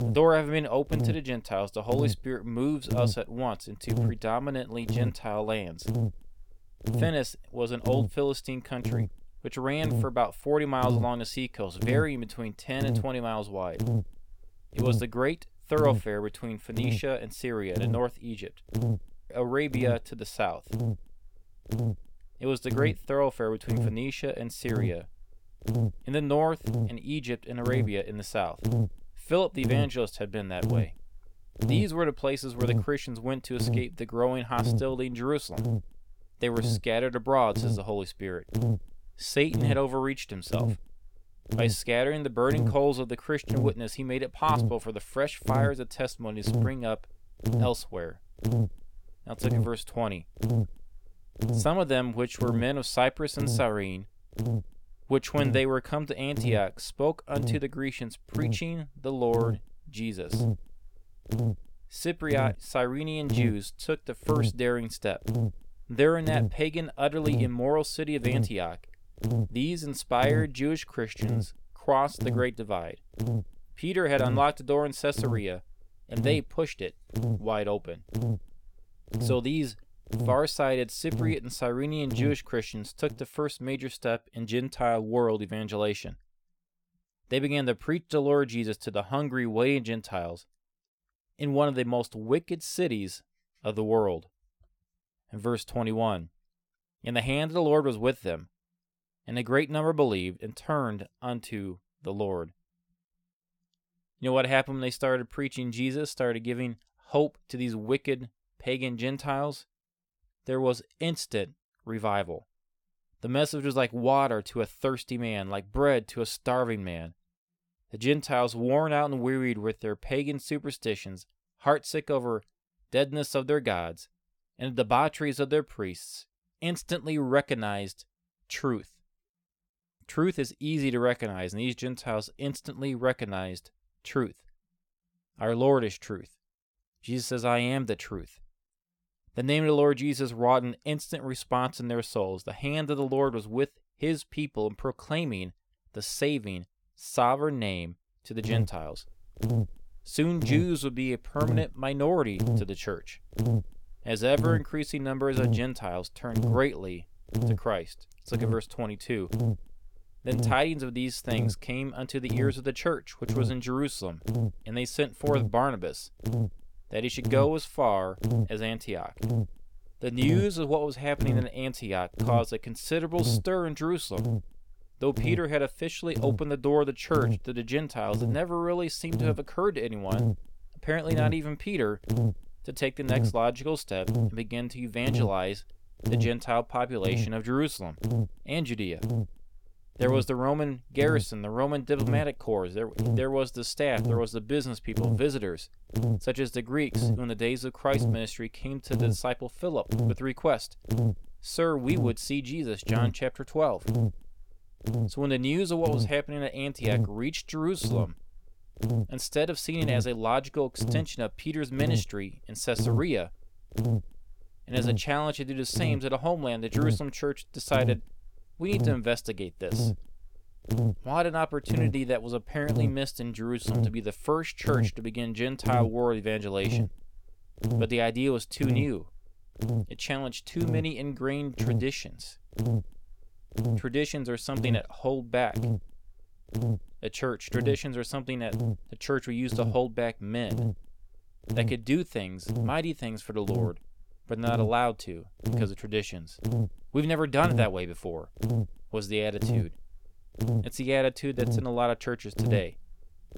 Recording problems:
electrical hum; loud; until 1:23 and from 2:28 on; 60 Hz, 10 dB below the speech

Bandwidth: 17 kHz